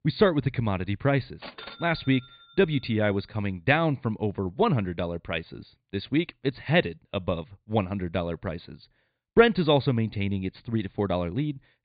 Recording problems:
high frequencies cut off; severe; nothing above 4.5 kHz

